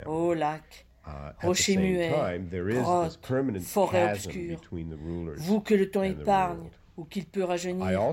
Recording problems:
voice in the background; loud; throughout; 6 dB below the speech

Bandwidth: 16 kHz